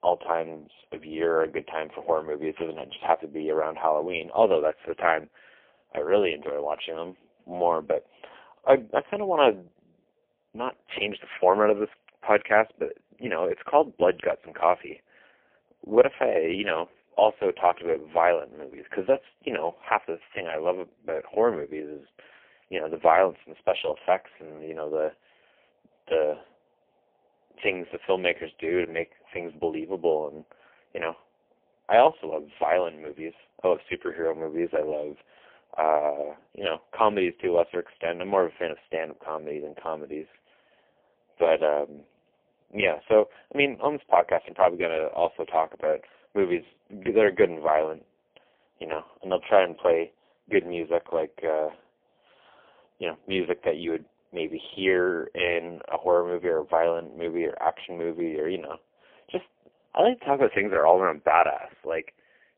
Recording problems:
phone-call audio; poor line; nothing above 3.5 kHz

